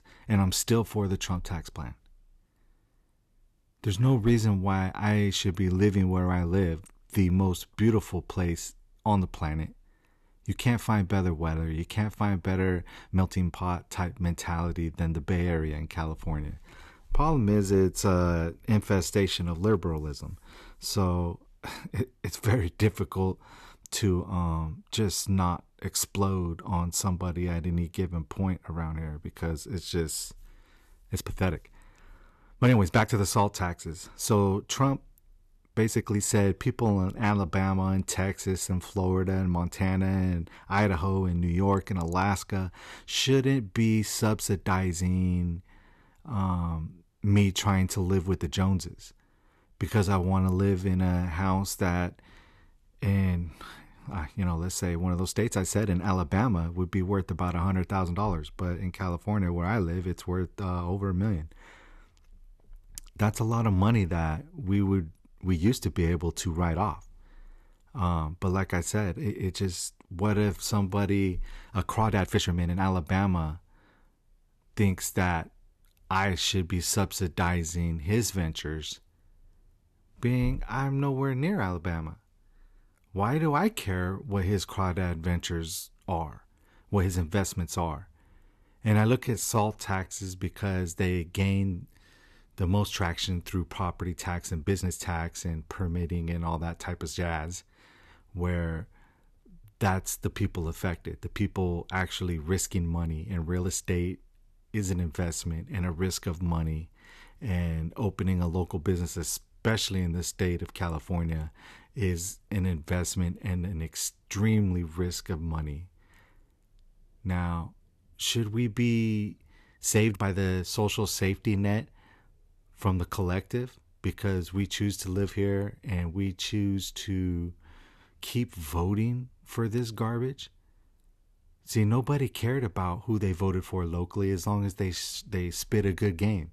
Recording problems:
uneven, jittery; strongly; from 13 s to 2:00

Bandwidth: 13.5 kHz